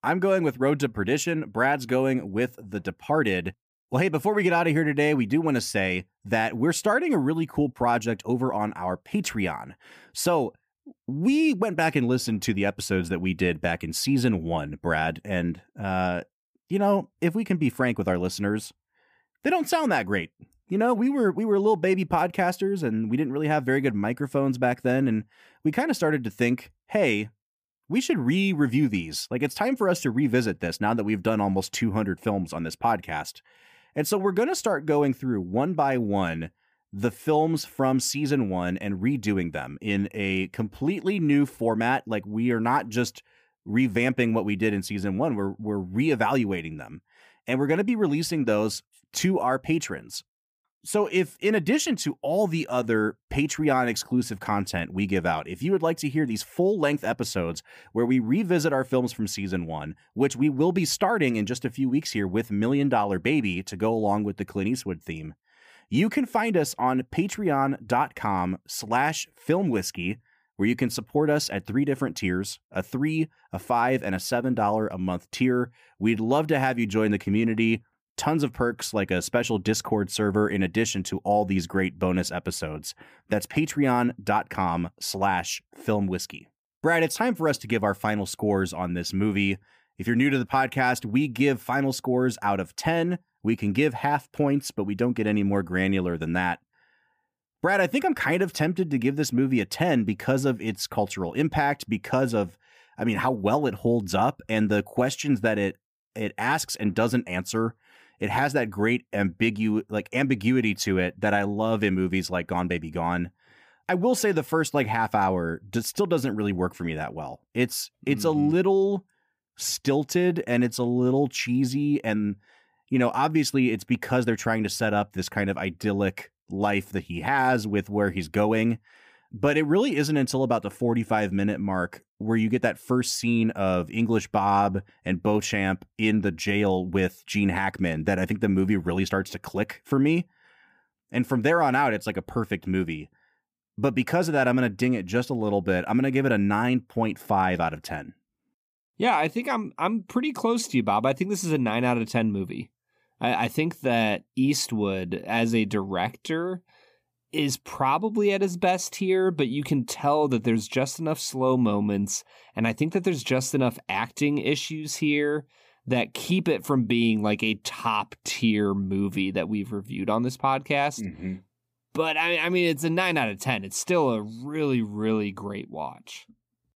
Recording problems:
none

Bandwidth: 15 kHz